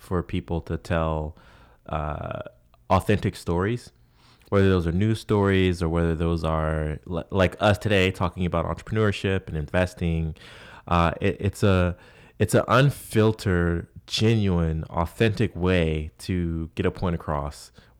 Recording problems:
none

